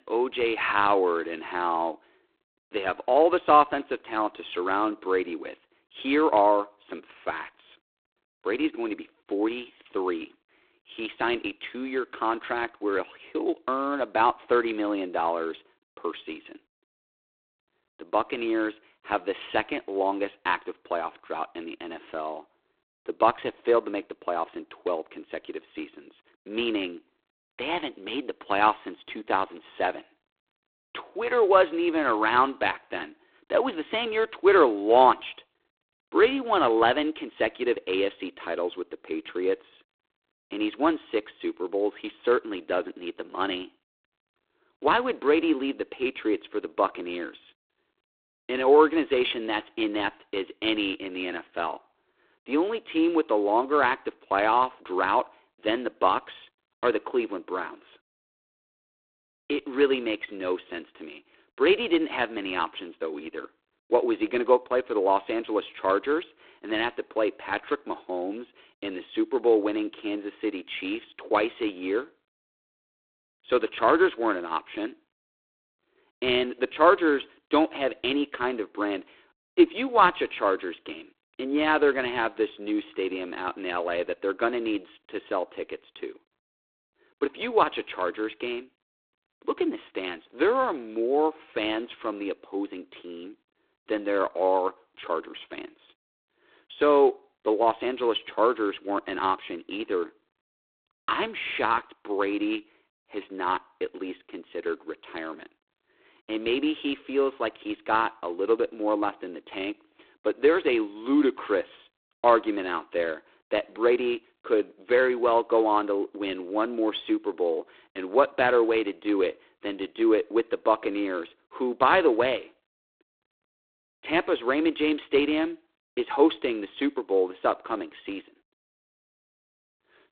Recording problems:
phone-call audio; poor line

